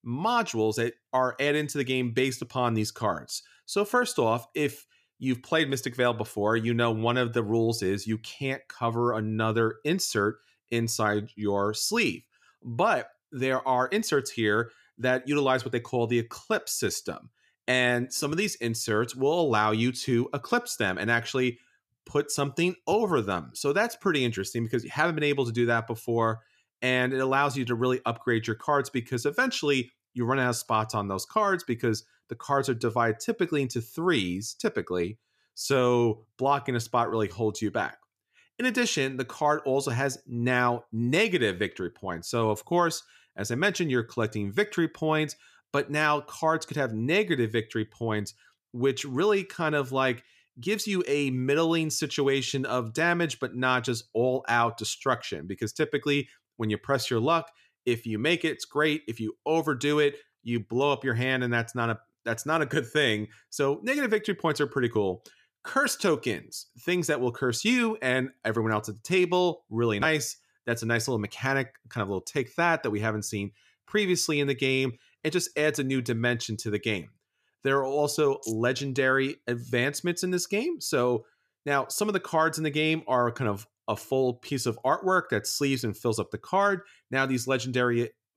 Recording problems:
none

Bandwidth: 14.5 kHz